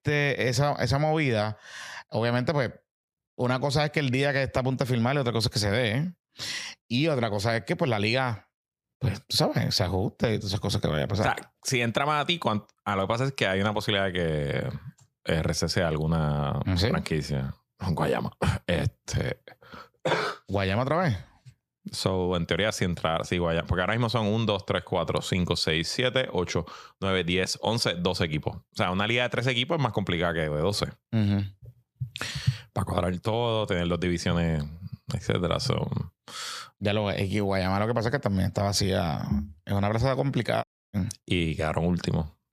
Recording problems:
audio cutting out; at 41 s

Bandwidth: 14.5 kHz